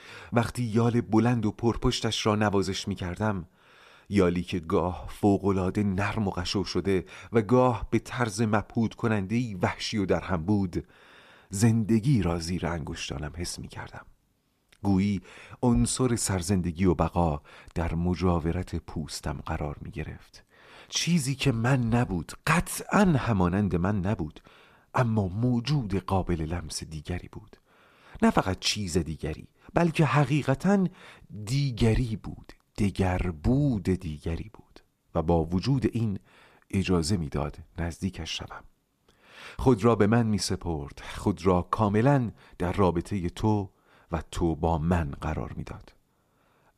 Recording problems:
none

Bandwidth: 14.5 kHz